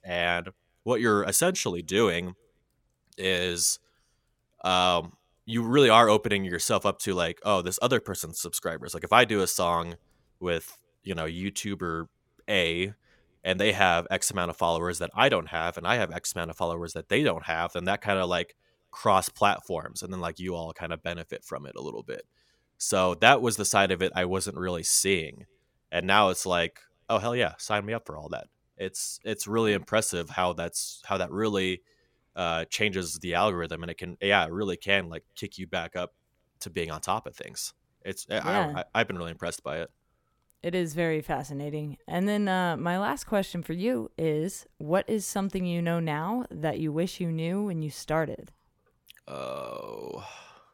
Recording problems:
none

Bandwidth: 17 kHz